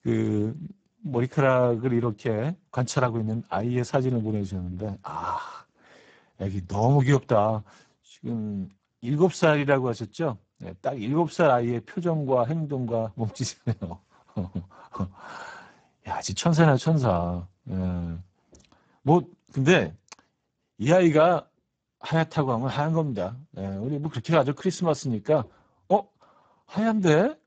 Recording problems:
garbled, watery; badly; nothing above 7.5 kHz

